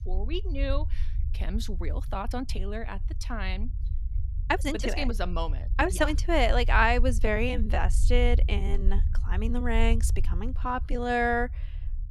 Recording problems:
low rumble; faint; throughout; 20 dB below the speech
uneven, jittery; strongly; from 2 to 11 s

